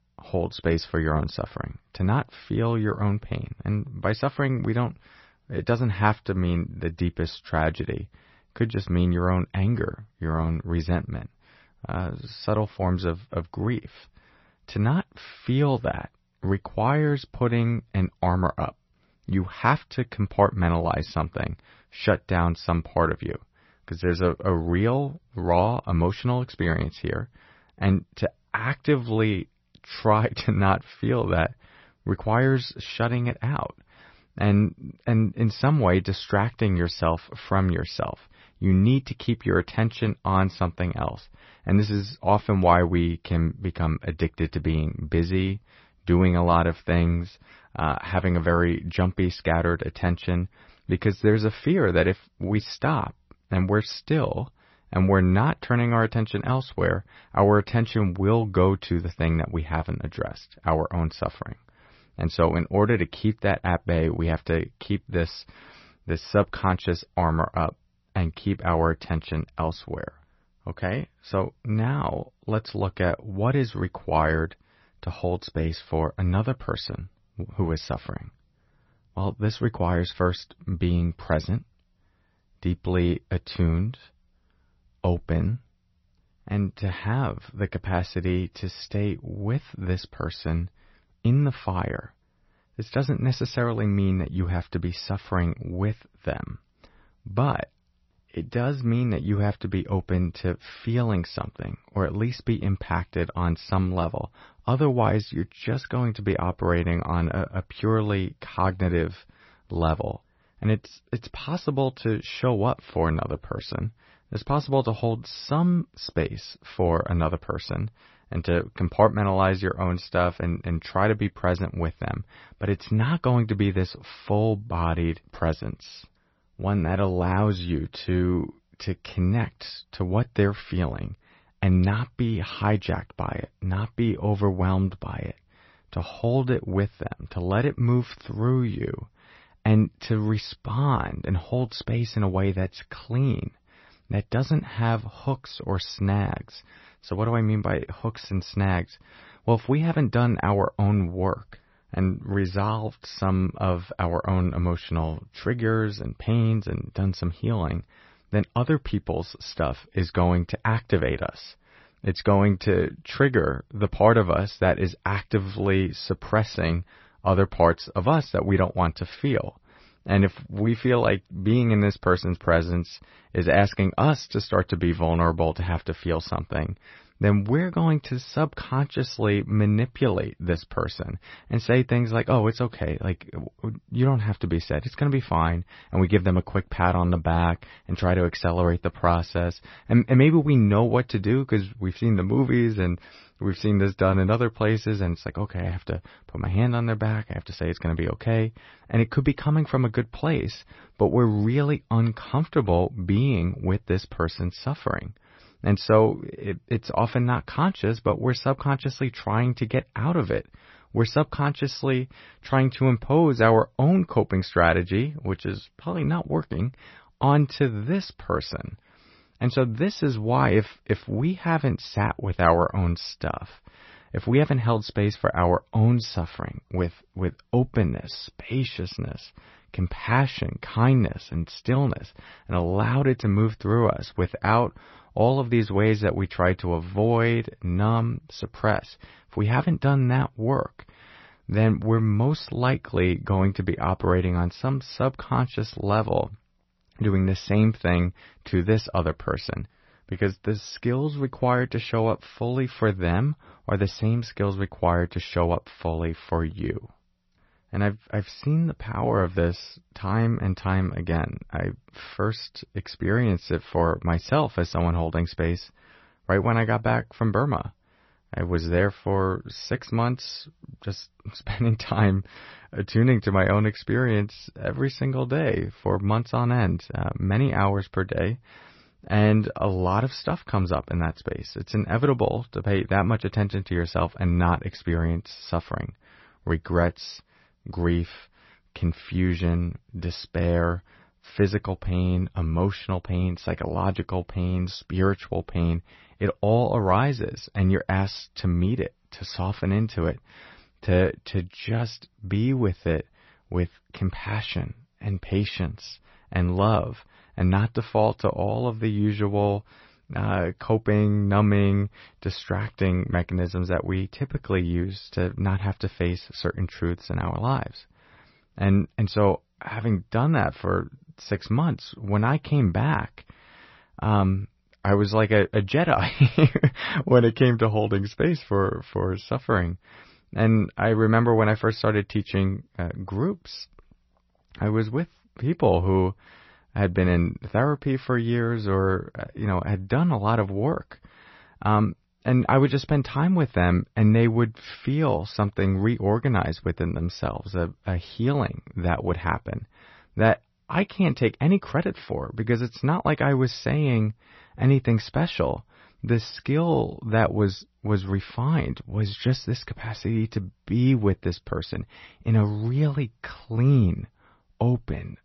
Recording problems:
garbled, watery; slightly; nothing above 6 kHz

